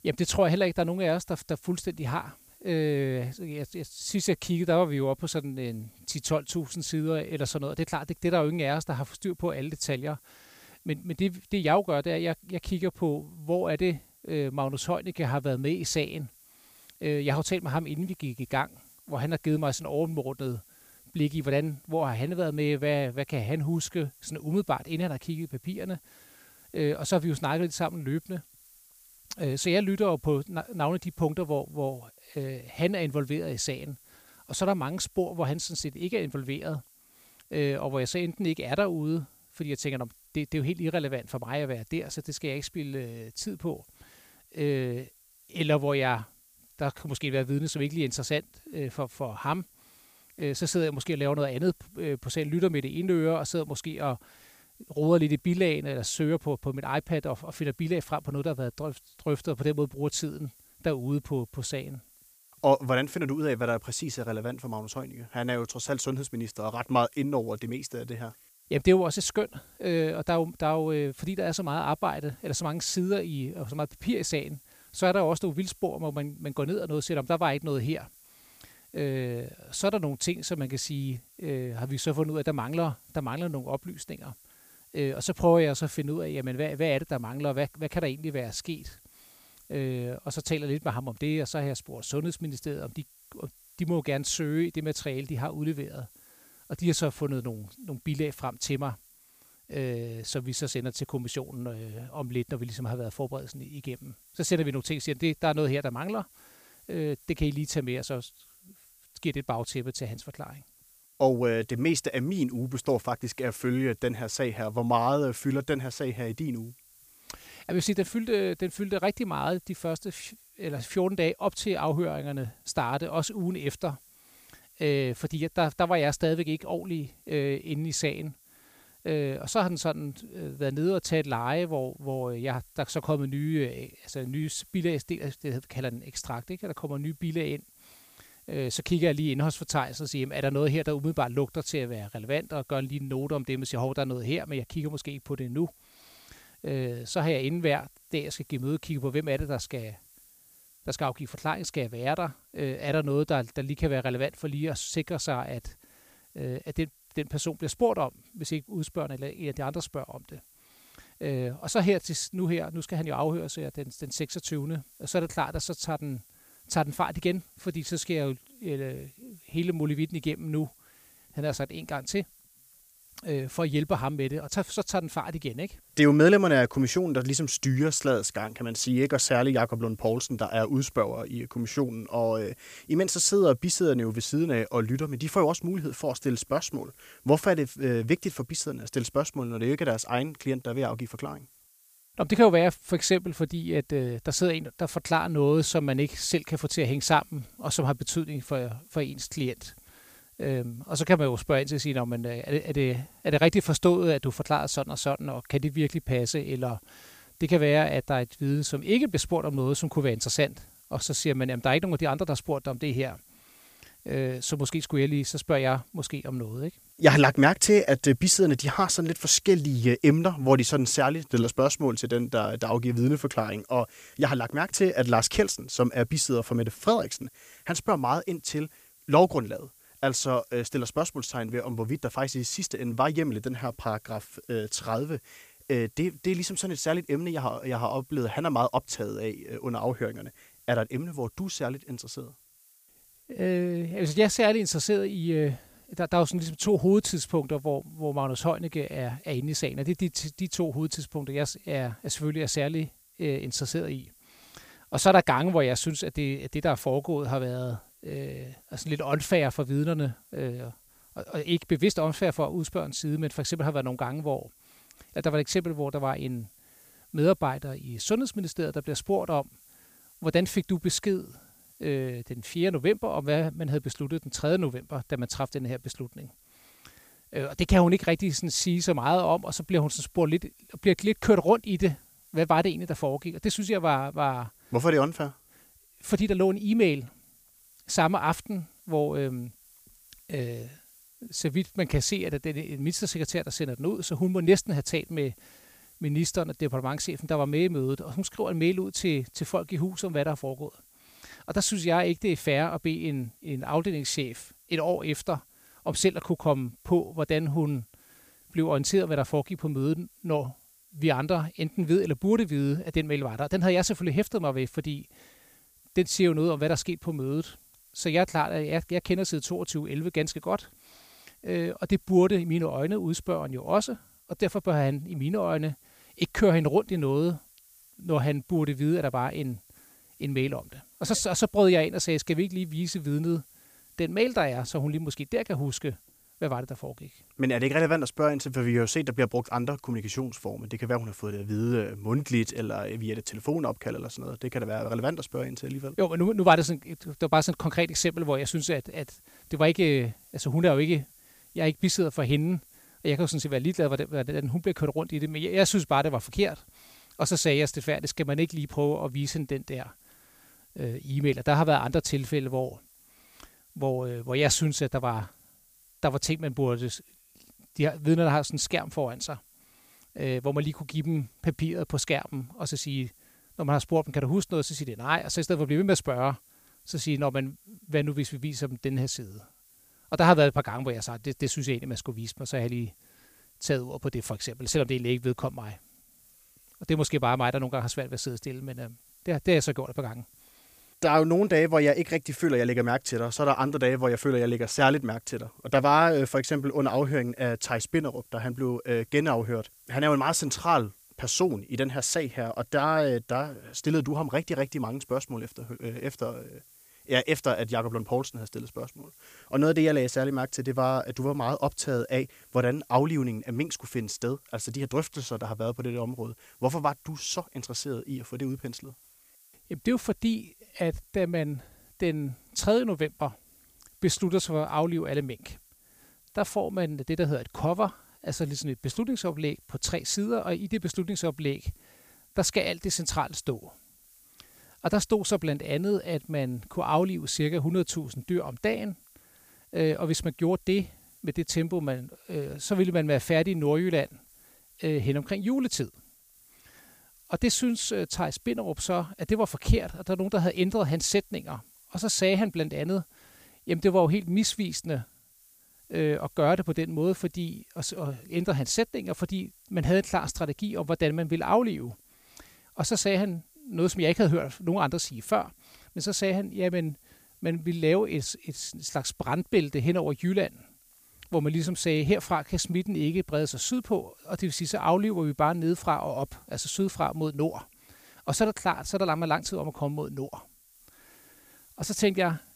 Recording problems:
hiss; faint; throughout; 25 dB below the speech

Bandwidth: 15 kHz